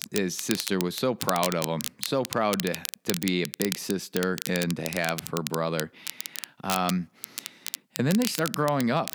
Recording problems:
crackle, like an old record; loud; 6 dB below the speech

